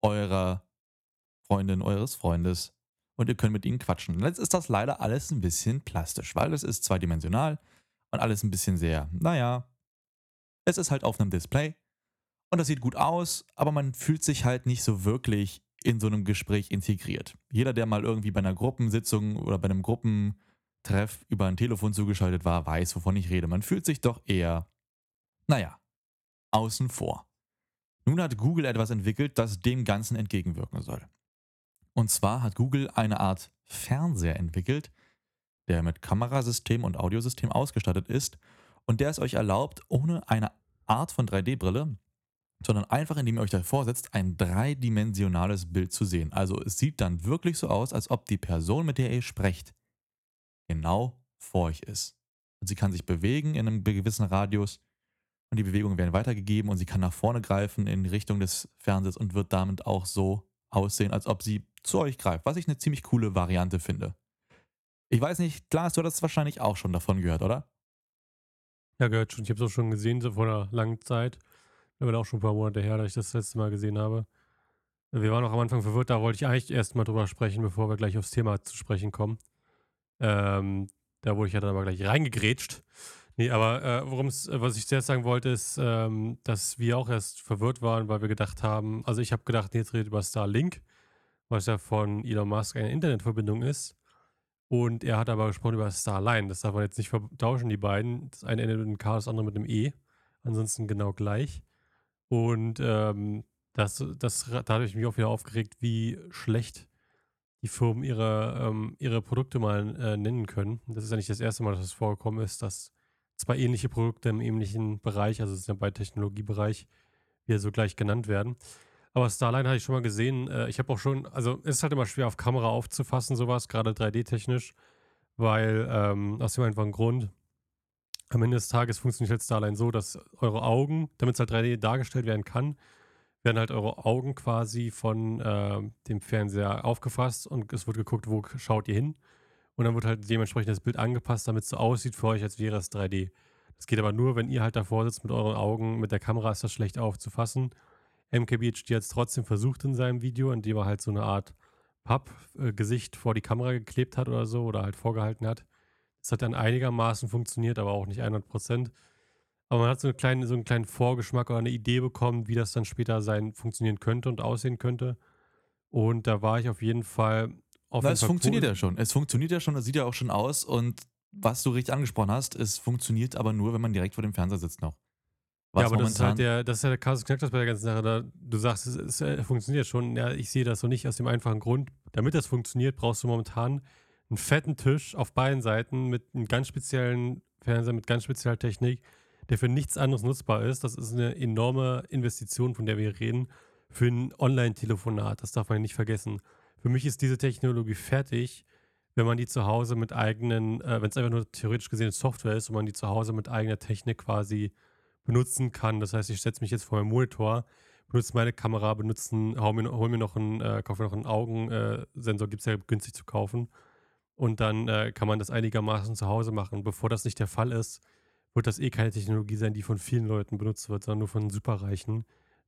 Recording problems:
none

